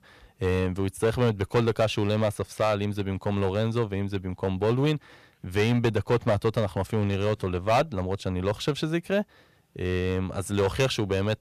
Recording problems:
distortion; slight; 5% of the sound clipped

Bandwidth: 14.5 kHz